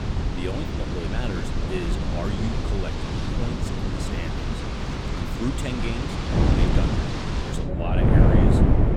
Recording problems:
wind noise on the microphone; heavy; 3 dB above the speech
wind in the background; loud; throughout; 2 dB below the speech

